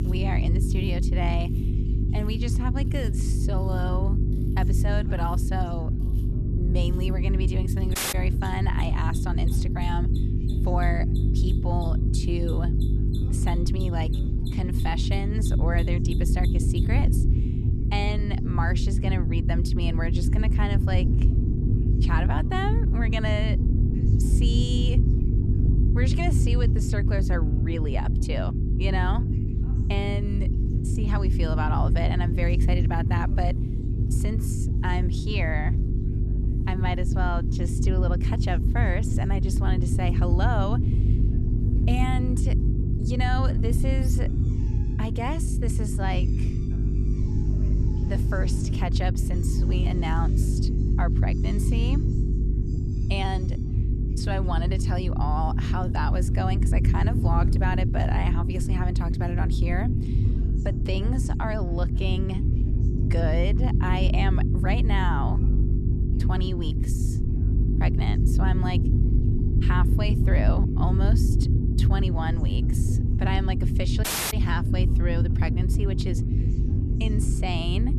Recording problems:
electrical hum; loud; throughout; 50 Hz, 7 dB below the speech
low rumble; loud; throughout; 7 dB below the speech
machinery noise; faint; until 58 s; 20 dB below the speech
background chatter; faint; throughout; 2 voices, 25 dB below the speech
audio cutting out; at 8 s and at 1:14

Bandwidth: 13.5 kHz